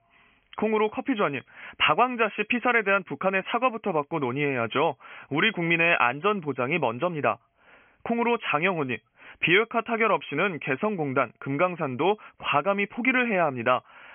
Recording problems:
high frequencies cut off; severe; nothing above 3.5 kHz
thin; very slightly; fading below 300 Hz

